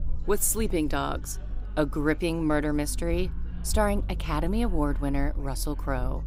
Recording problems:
chatter from many people; faint; throughout; 25 dB below the speech
low rumble; faint; throughout; 25 dB below the speech

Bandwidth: 15.5 kHz